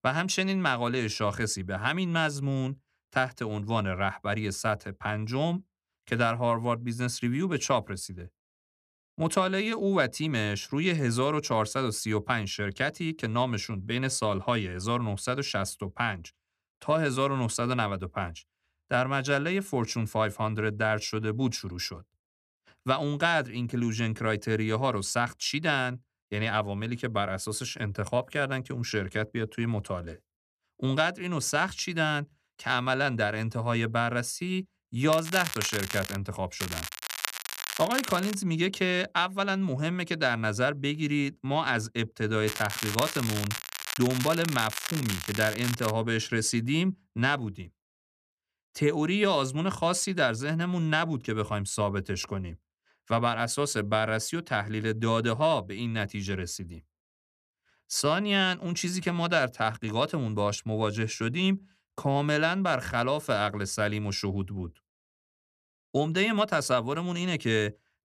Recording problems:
crackling; loud; from 35 to 36 s, from 37 to 38 s and from 42 to 46 s; 5 dB below the speech

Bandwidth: 14.5 kHz